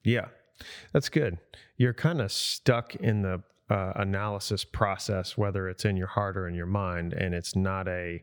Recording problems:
none

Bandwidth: 18.5 kHz